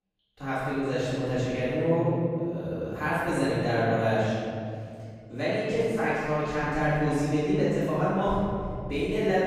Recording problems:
room echo; strong; dies away in 2.4 s
off-mic speech; far

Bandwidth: 15.5 kHz